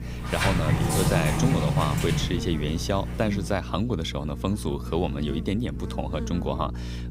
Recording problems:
electrical hum; noticeable; throughout; 60 Hz, 15 dB below the speech
door banging; loud; until 3.5 s; peak 5 dB above the speech

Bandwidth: 15.5 kHz